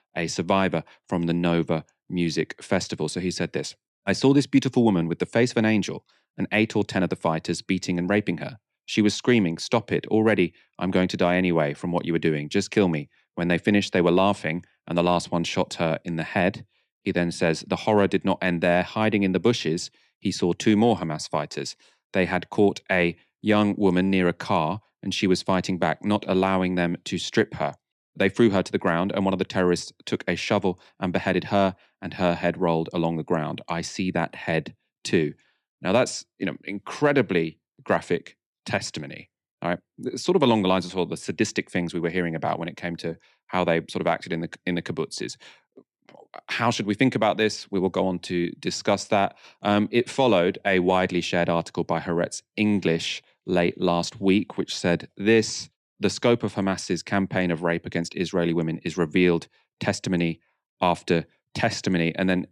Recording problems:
none

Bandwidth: 15 kHz